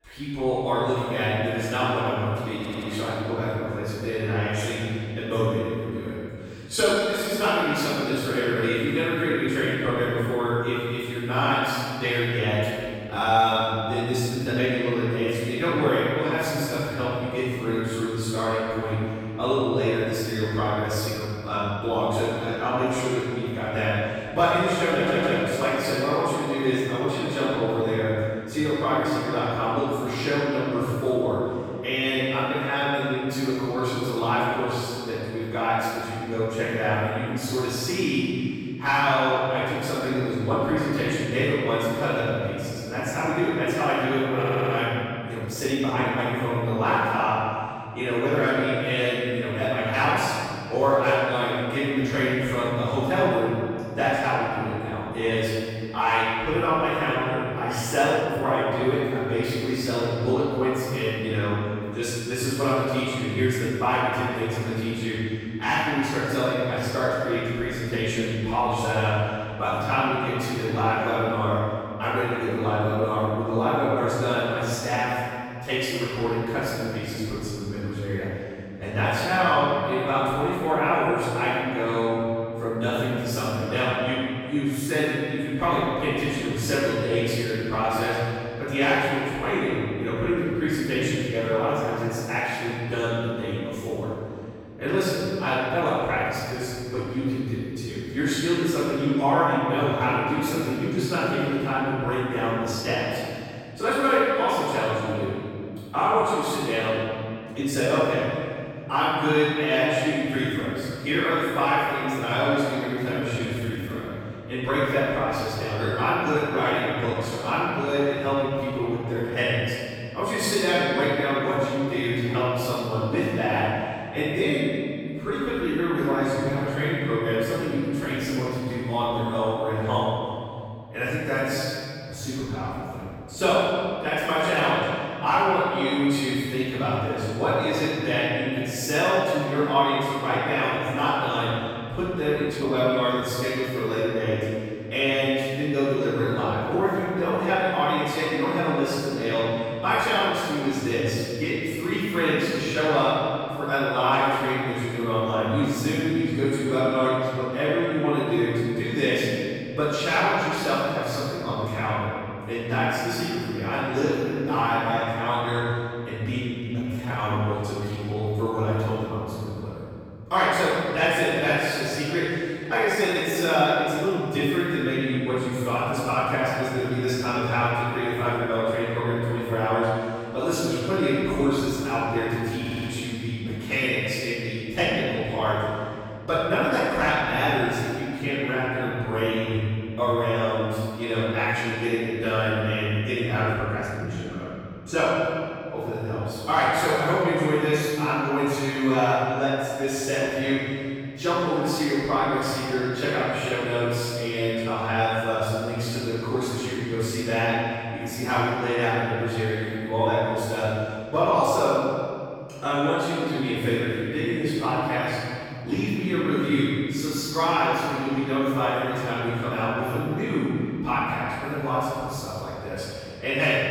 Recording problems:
room echo; strong; dies away in 2.4 s
off-mic speech; far
audio stuttering; 4 times, first at 2.5 s
uneven, jittery; strongly; from 6.5 s to 3:36

